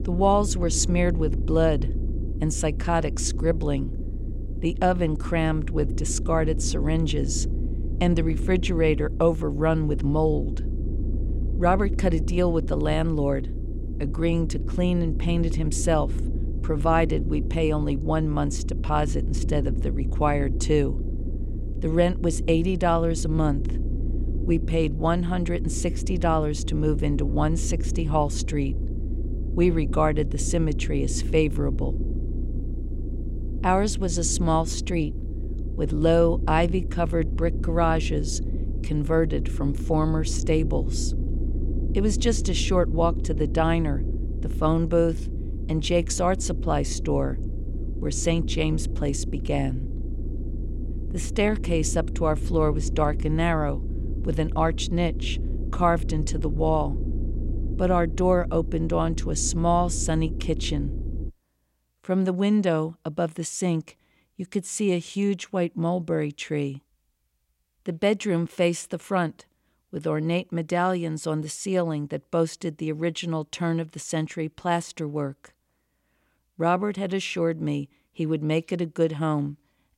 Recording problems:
low rumble; noticeable; until 1:01; 15 dB below the speech

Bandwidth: 16 kHz